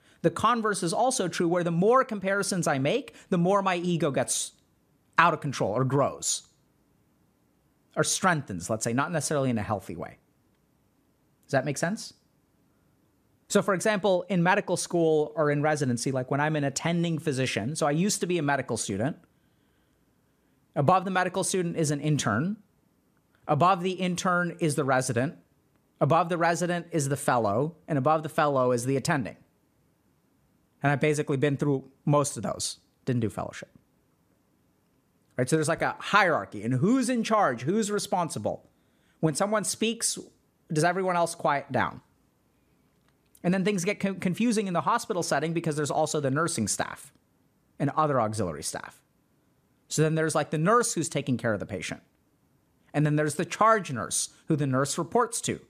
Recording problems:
none

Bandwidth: 14.5 kHz